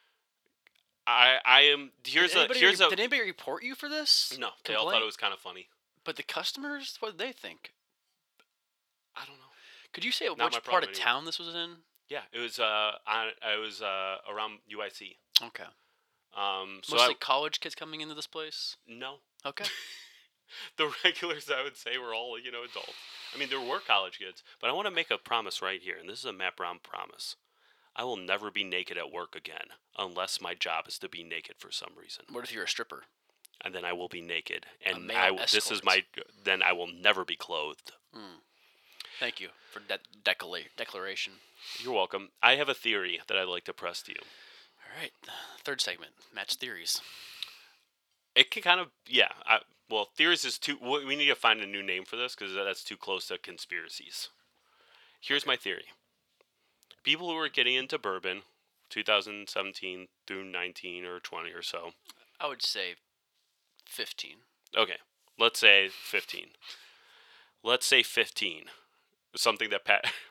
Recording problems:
thin; very; fading below 650 Hz

